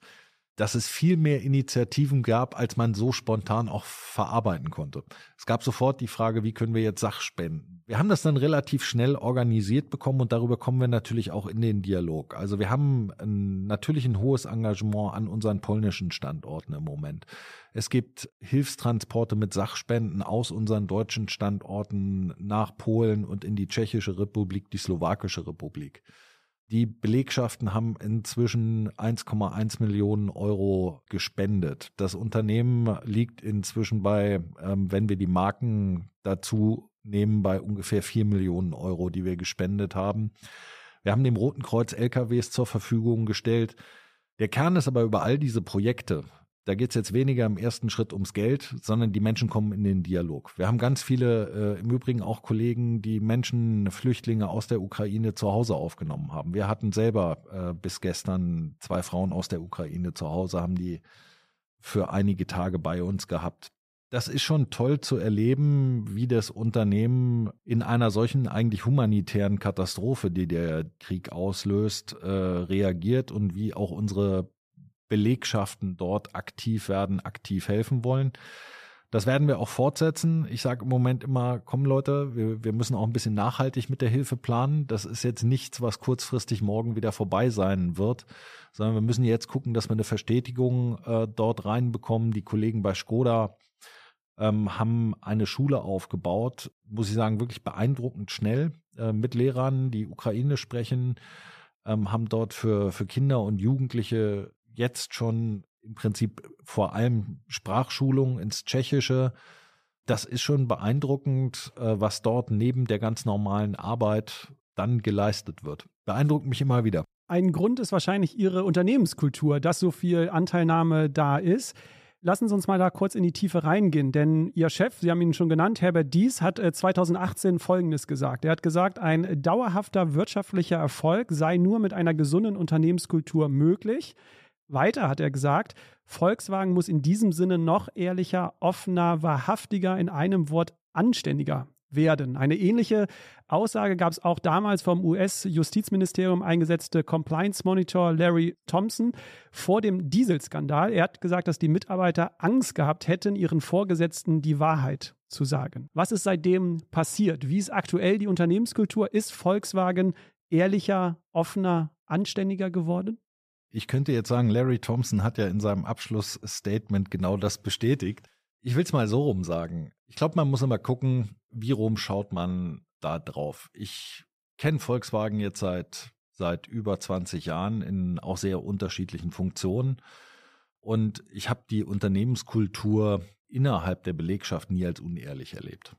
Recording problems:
none

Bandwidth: 14.5 kHz